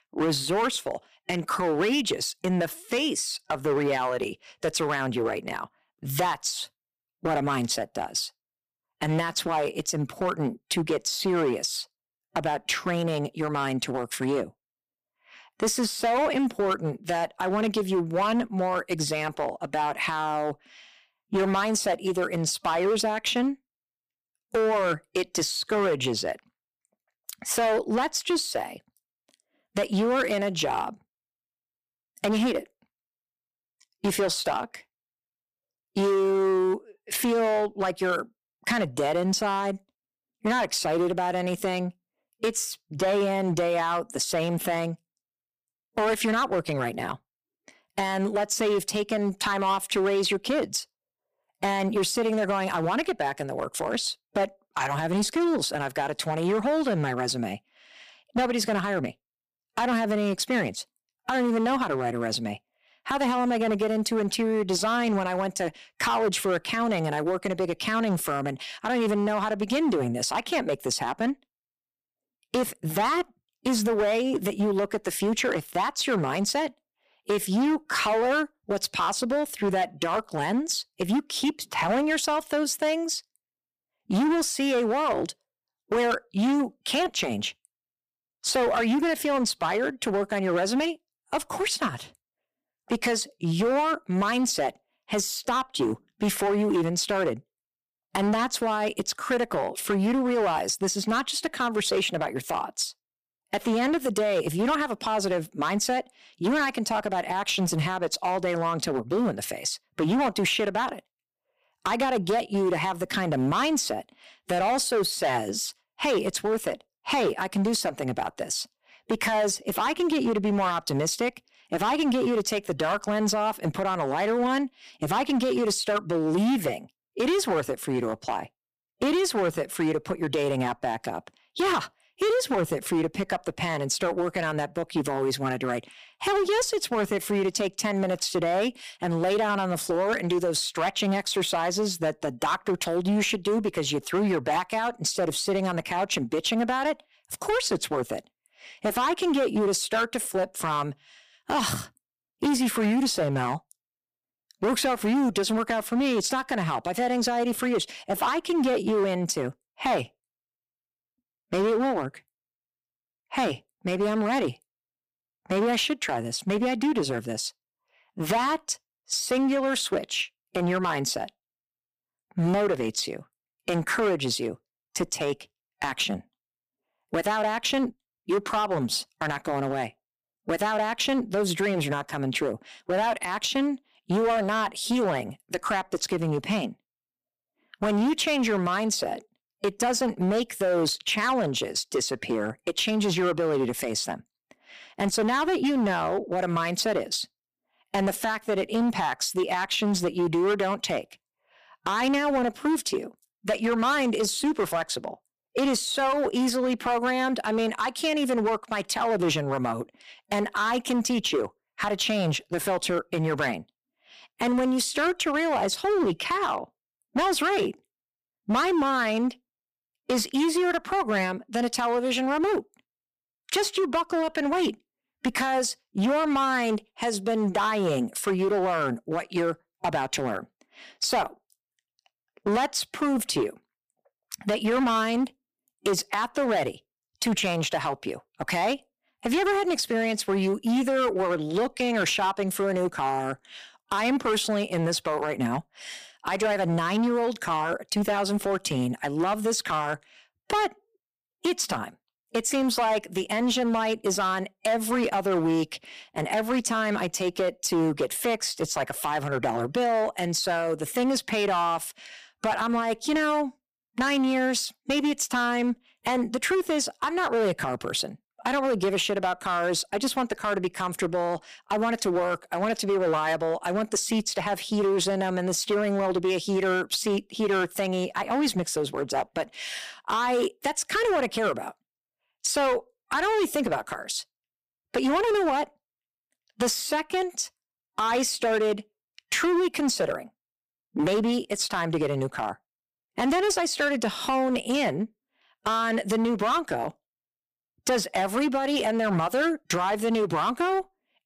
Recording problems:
distortion; slight; 12% of the sound clipped

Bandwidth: 15 kHz